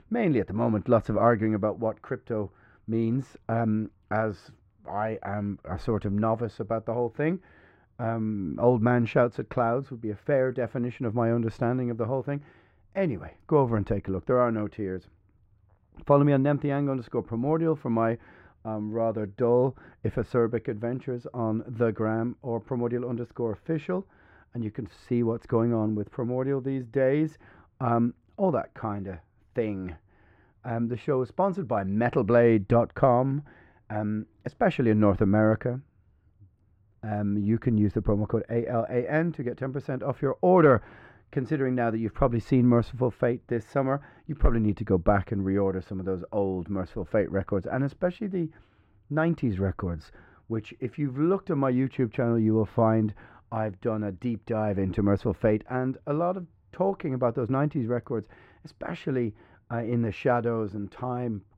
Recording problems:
muffled; very; fading above 3.5 kHz

